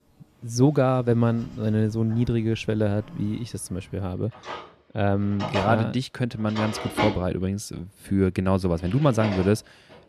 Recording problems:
household noises; loud; throughout; 8 dB below the speech

